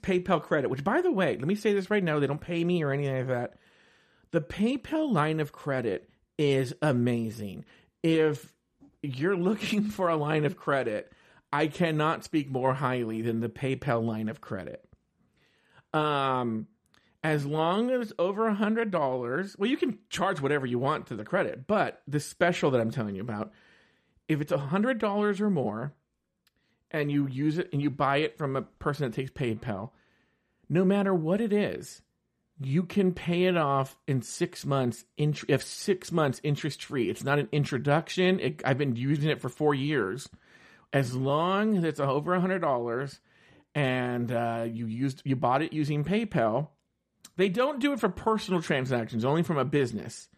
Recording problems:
none

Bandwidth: 14.5 kHz